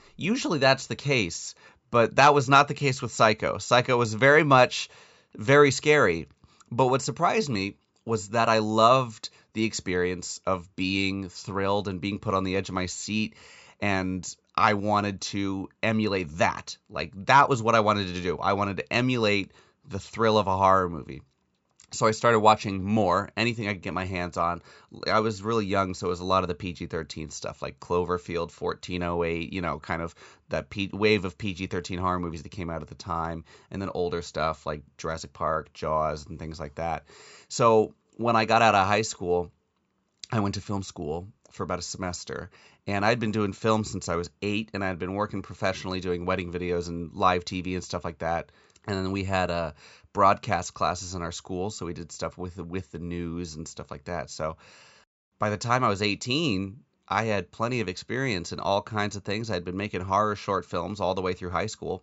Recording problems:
high frequencies cut off; noticeable; nothing above 8 kHz

